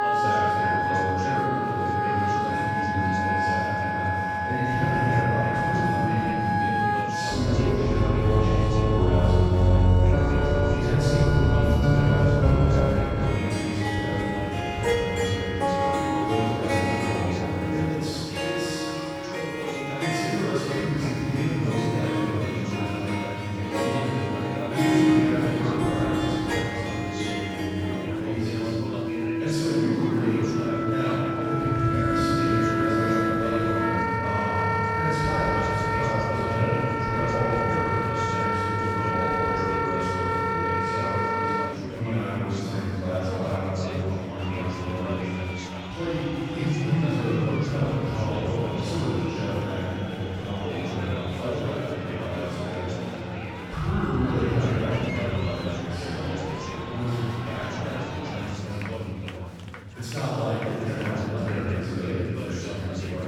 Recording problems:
room echo; strong; dies away in 3 s
off-mic speech; far
background music; very loud; until 42 s; 3 dB above the speech
chatter from many people; loud; throughout; 7 dB below the speech

